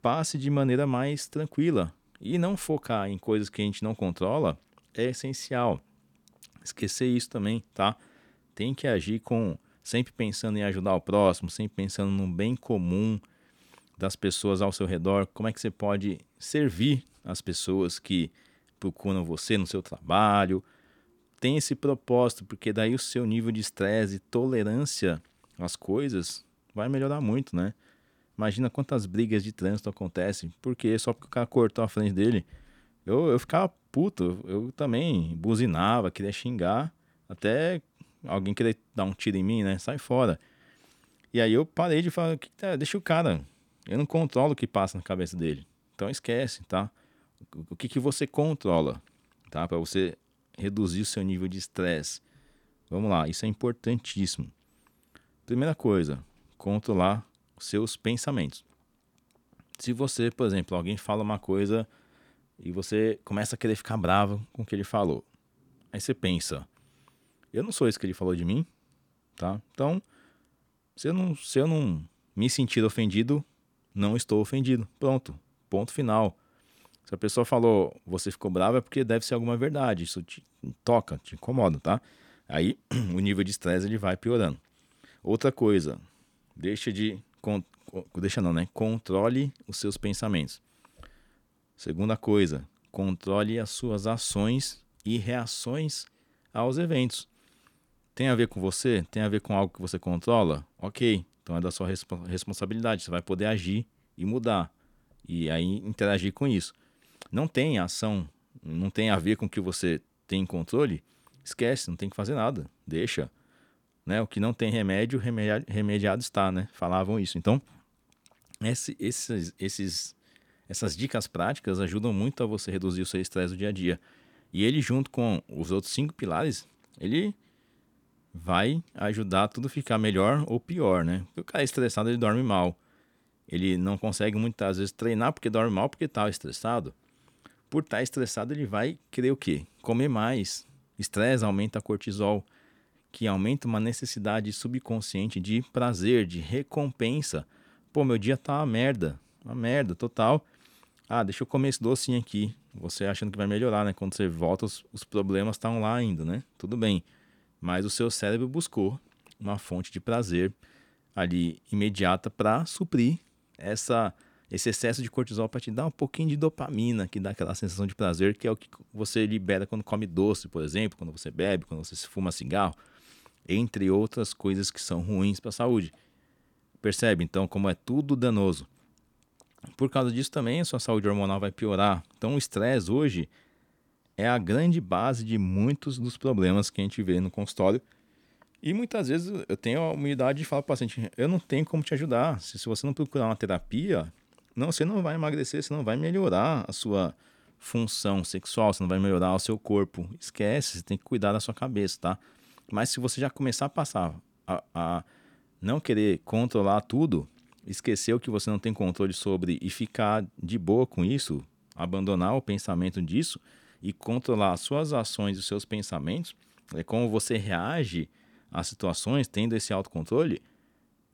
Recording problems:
none

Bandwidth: 18.5 kHz